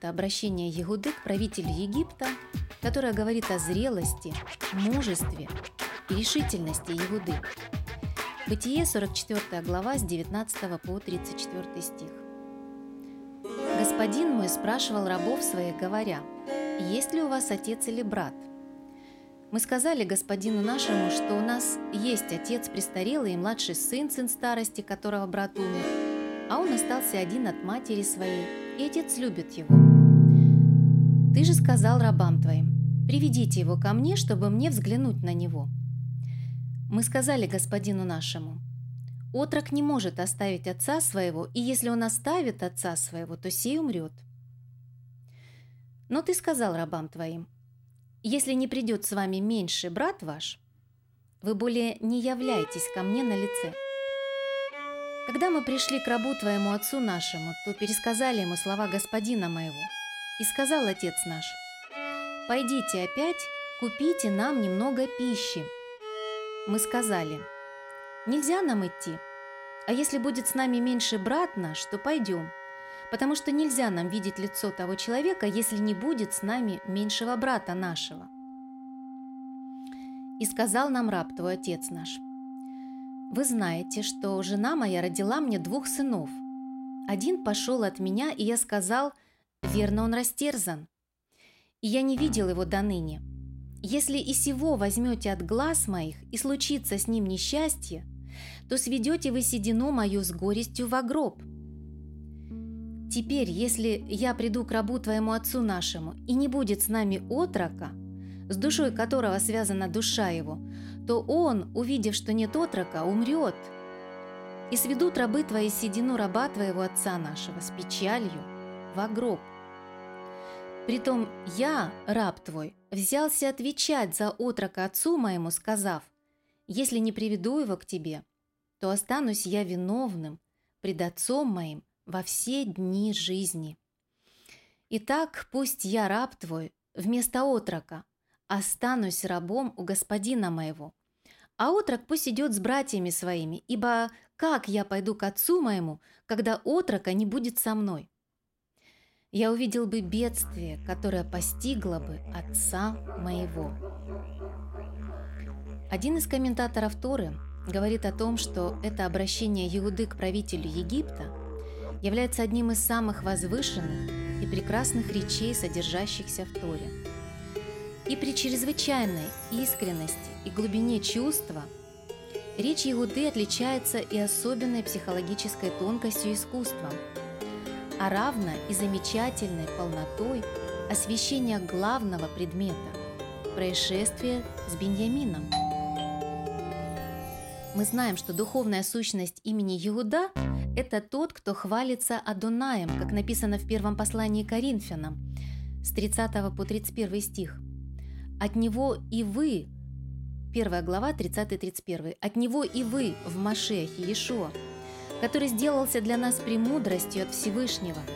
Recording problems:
background music; loud; throughout; 4 dB below the speech
dog barking; faint; from 2:33 to 2:35; peak 15 dB below the speech
doorbell; noticeable; from 3:06 to 3:07; peak level with the speech

